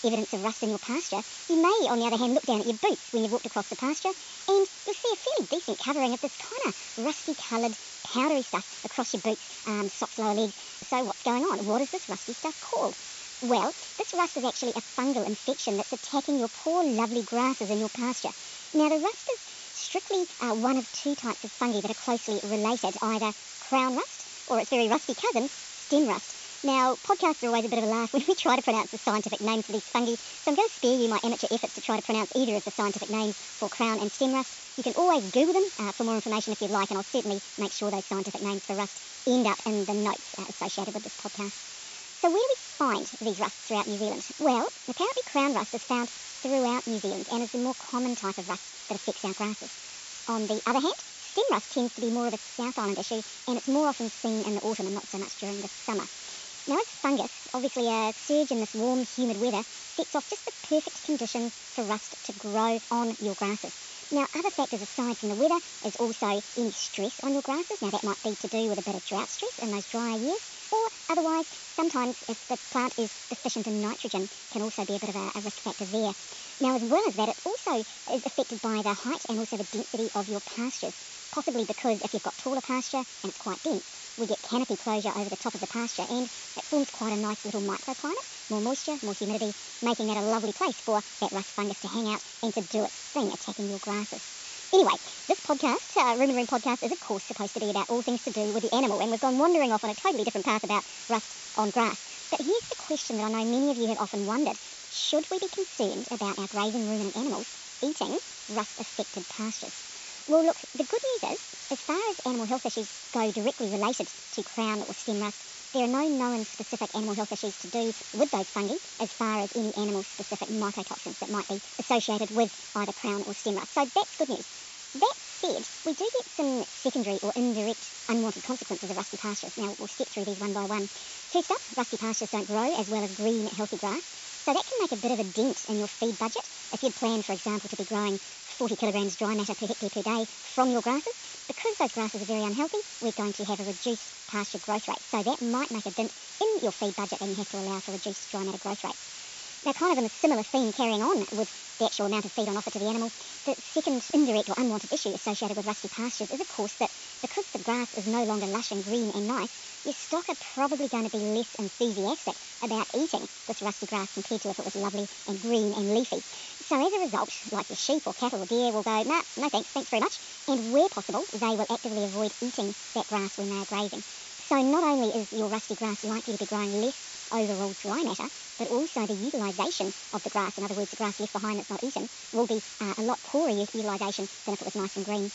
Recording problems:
wrong speed and pitch; too fast and too high; 1.5 times normal speed
high frequencies cut off; noticeable; nothing above 8 kHz
hiss; loud; throughout; 10 dB below the speech

